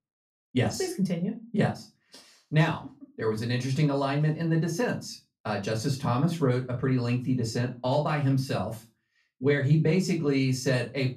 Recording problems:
off-mic speech; far
room echo; very slight; dies away in 0.2 s

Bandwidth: 14.5 kHz